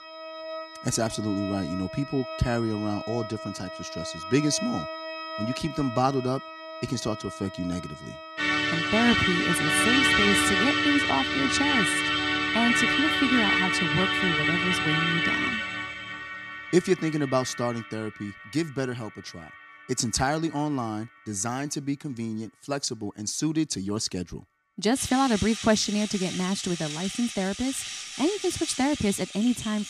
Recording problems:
background music; very loud; throughout; 2 dB above the speech

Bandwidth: 14.5 kHz